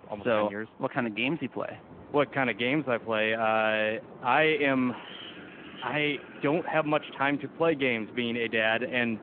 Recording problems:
phone-call audio
wind in the background; noticeable; throughout; 20 dB below the speech

